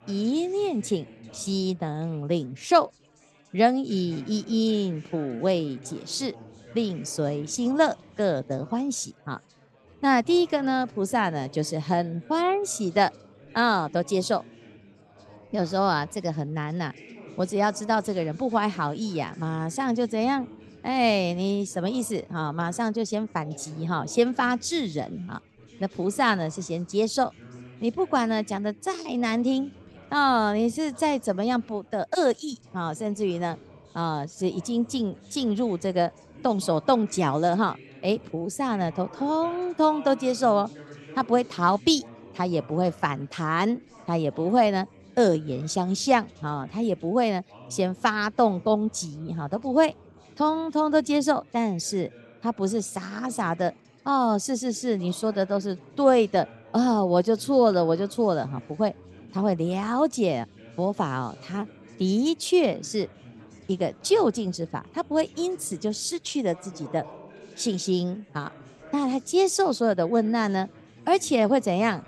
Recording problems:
chatter from many people; faint; throughout; 25 dB below the speech

